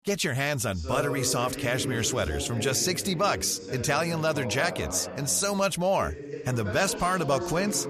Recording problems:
voice in the background; loud; throughout; 9 dB below the speech

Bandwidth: 14.5 kHz